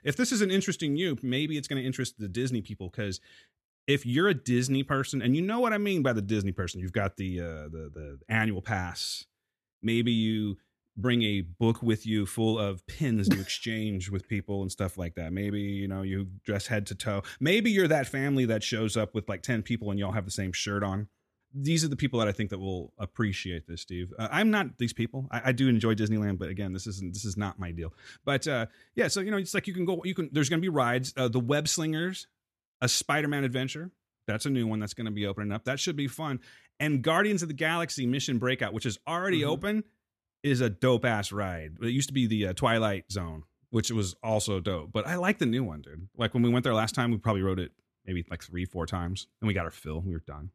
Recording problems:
none

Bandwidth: 13.5 kHz